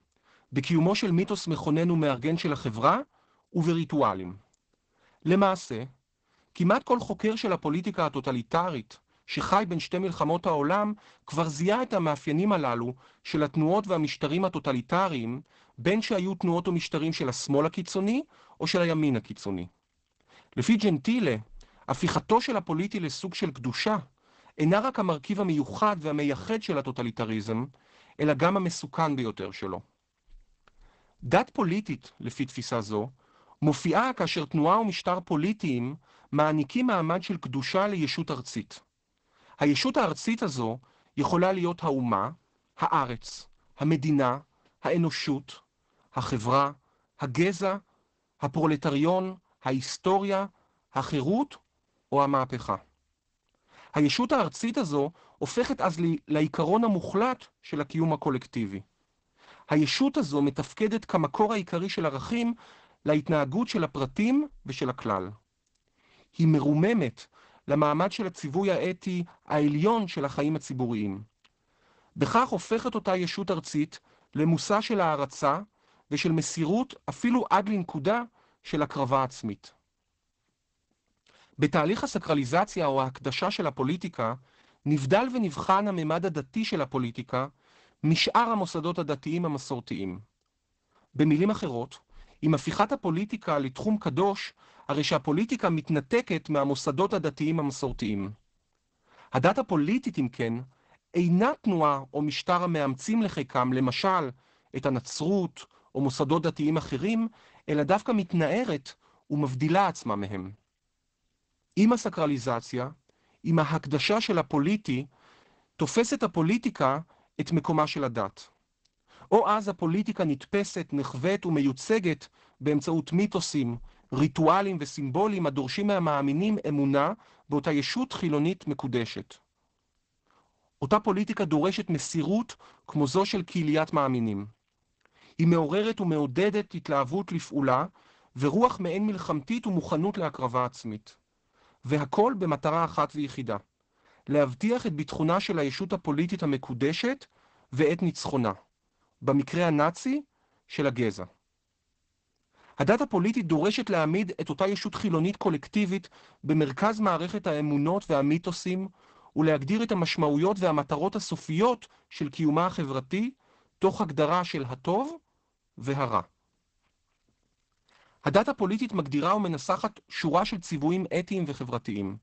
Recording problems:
garbled, watery; badly; nothing above 8 kHz

